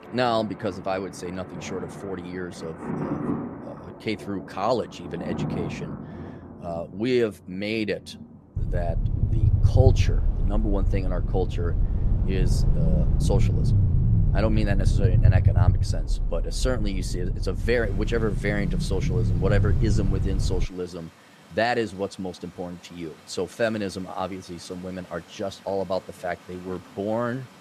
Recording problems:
rain or running water; loud; throughout; 9 dB below the speech
low rumble; loud; from 8.5 to 21 s; 8 dB below the speech

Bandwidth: 14.5 kHz